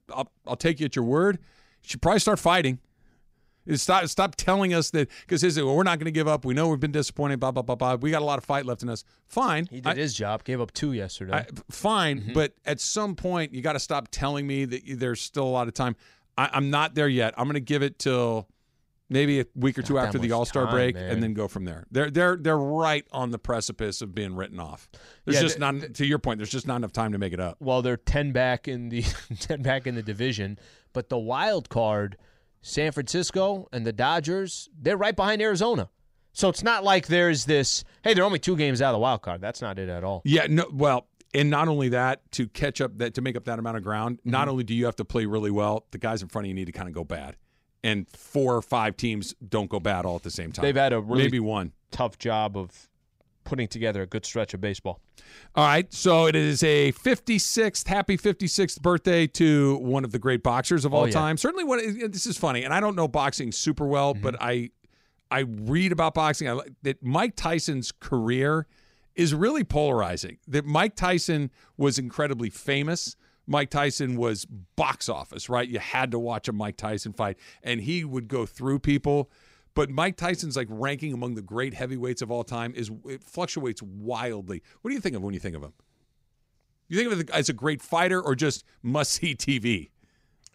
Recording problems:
none

